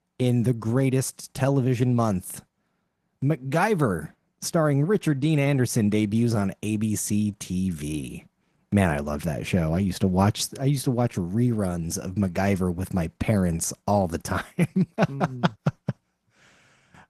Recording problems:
garbled, watery; slightly; nothing above 14 kHz

